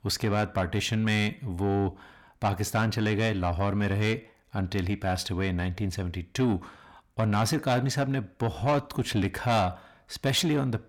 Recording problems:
distortion; slight; 10 dB below the speech

